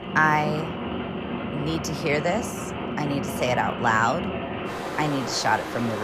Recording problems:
rain or running water; loud; throughout; 5 dB below the speech
abrupt cut into speech; at the end

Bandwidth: 15 kHz